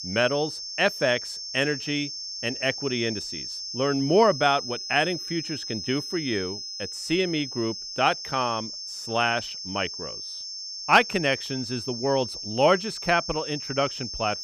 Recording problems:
high-pitched whine; loud; throughout; 5 kHz, 7 dB below the speech

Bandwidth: 15.5 kHz